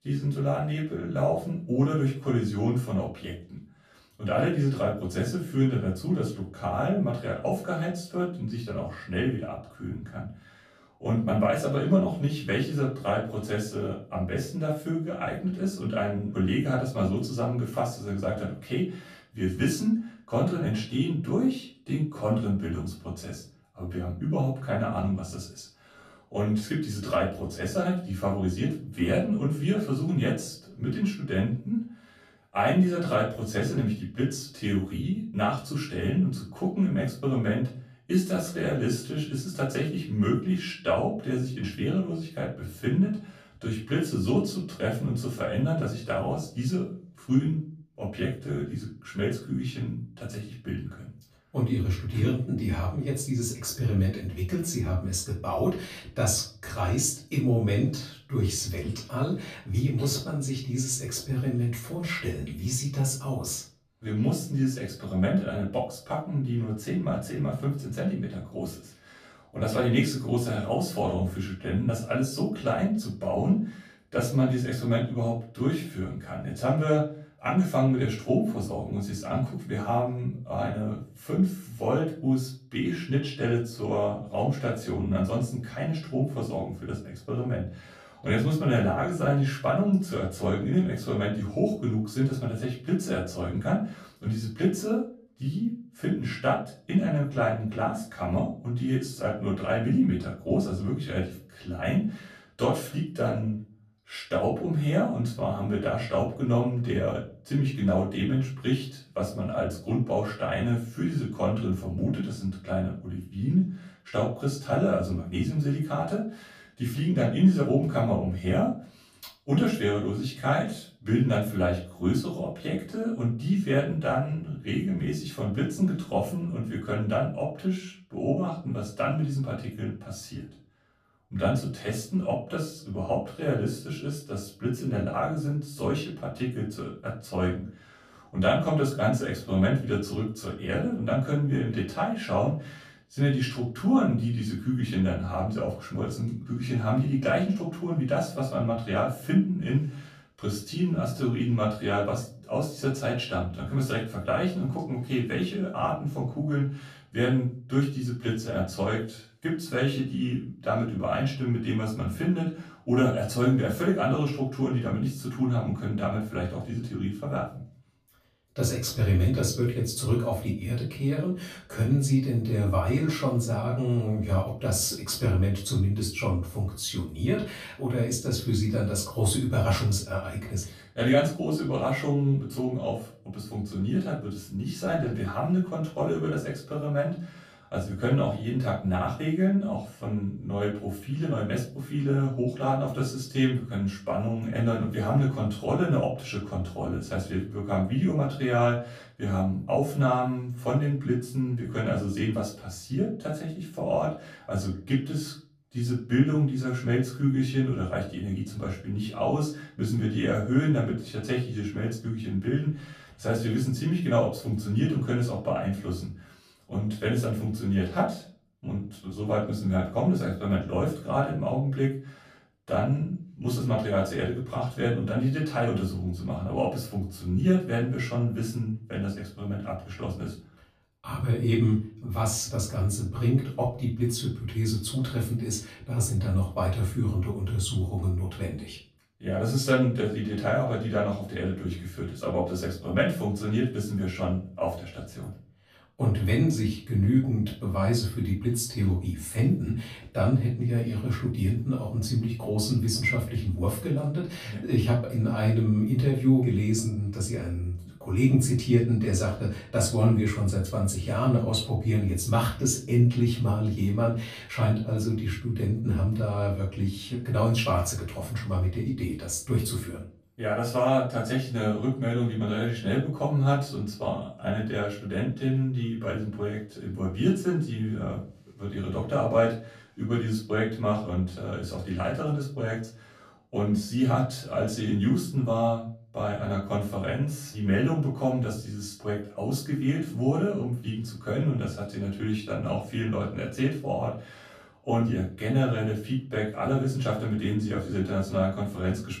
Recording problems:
off-mic speech; far
room echo; slight; dies away in 0.3 s

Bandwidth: 15 kHz